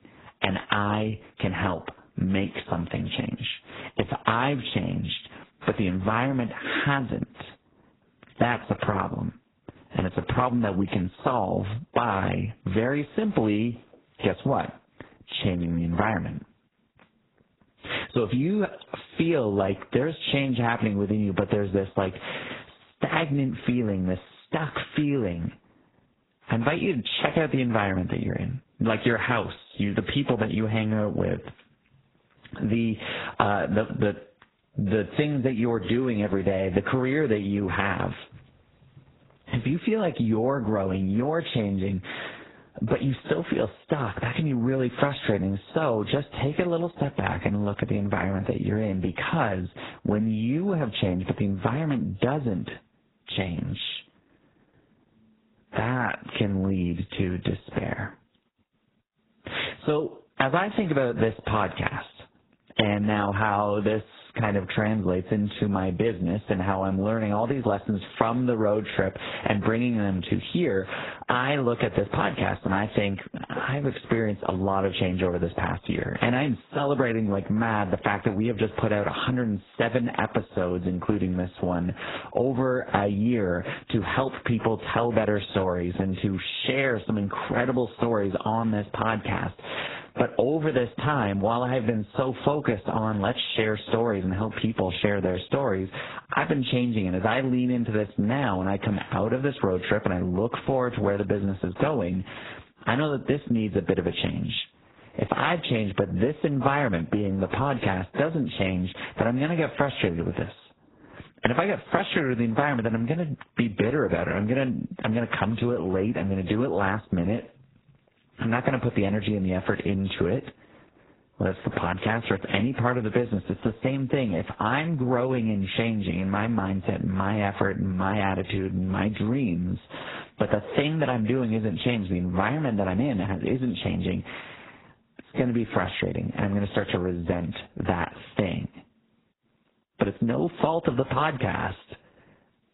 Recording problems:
garbled, watery; badly; nothing above 4 kHz
squashed, flat; heavily

